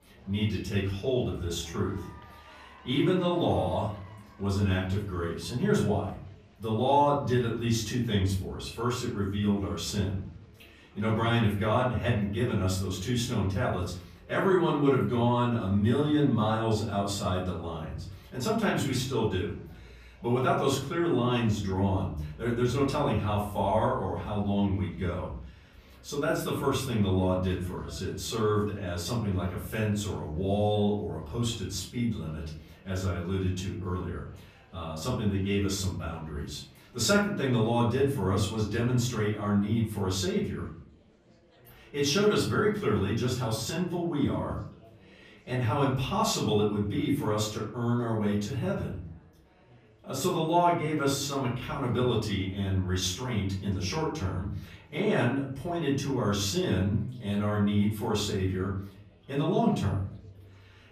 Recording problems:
off-mic speech; far
room echo; noticeable; dies away in 0.6 s
chatter from many people; faint; throughout; 30 dB below the speech

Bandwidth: 14.5 kHz